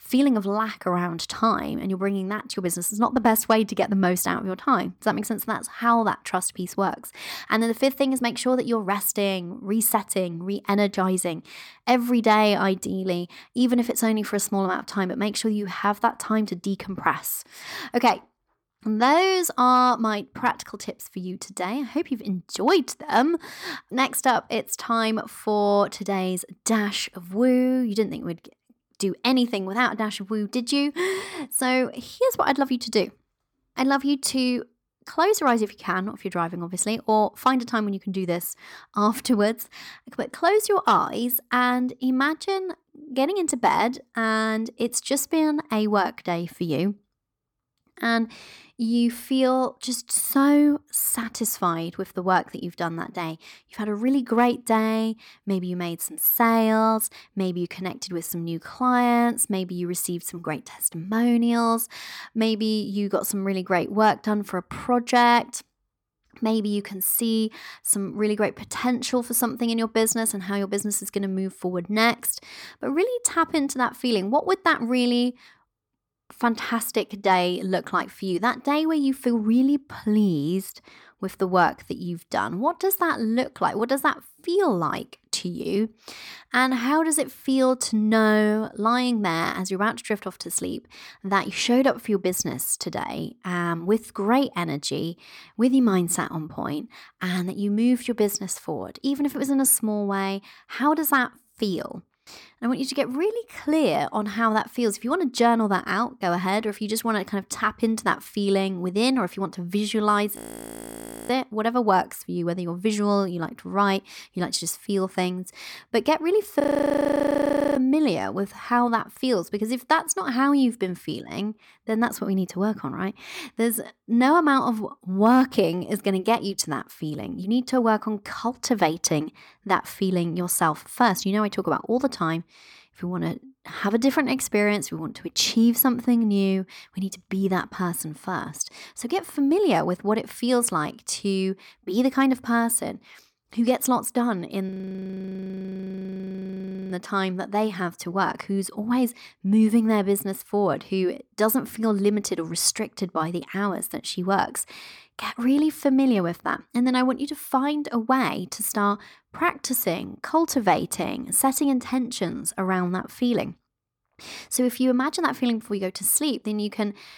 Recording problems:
audio freezing; at 1:50 for 1 s, at 1:57 for 1 s and at 2:25 for 2 s

